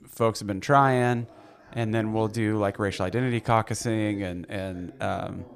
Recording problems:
voice in the background; faint; throughout; 20 dB below the speech

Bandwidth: 15 kHz